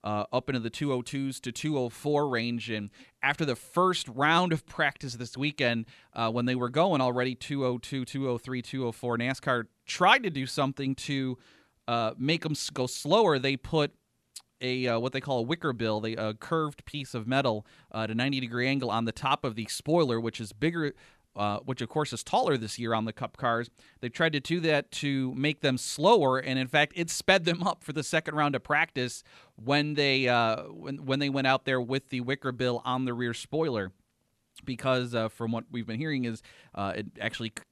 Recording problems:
none

